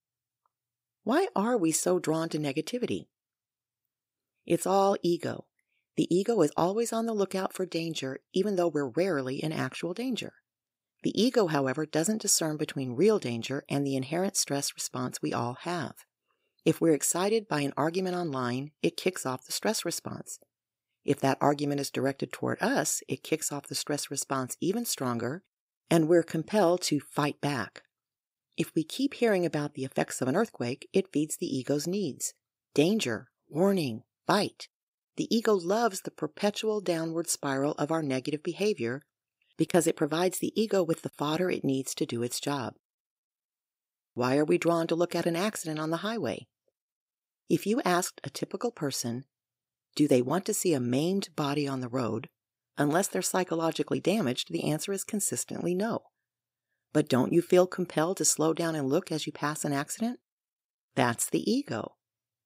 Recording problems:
uneven, jittery; strongly; from 1 s to 1:02

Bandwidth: 15.5 kHz